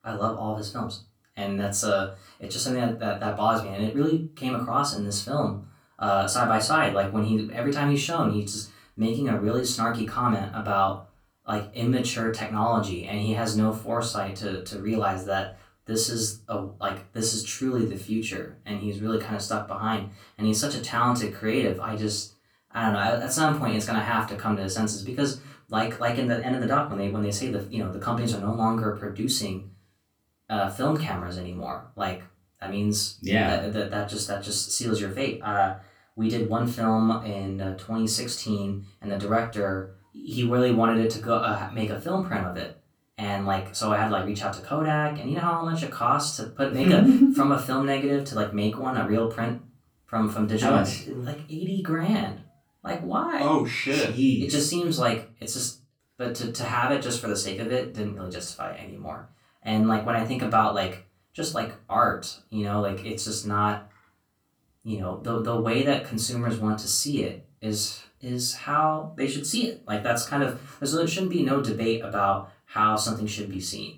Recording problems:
off-mic speech; far
room echo; very slight; dies away in 0.3 s

